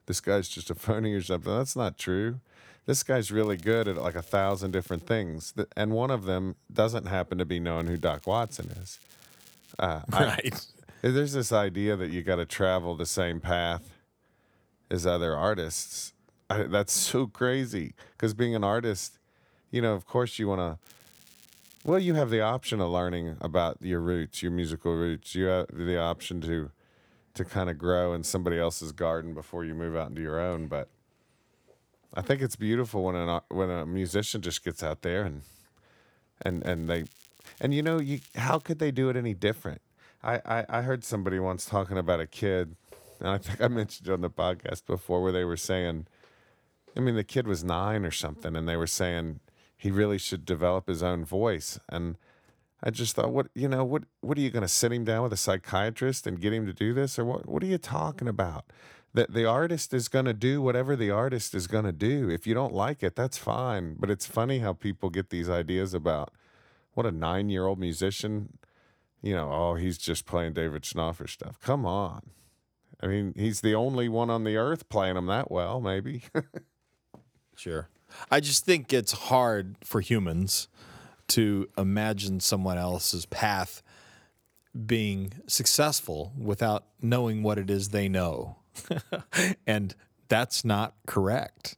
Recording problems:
crackling; faint; 4 times, first at 3.5 s; 25 dB below the speech

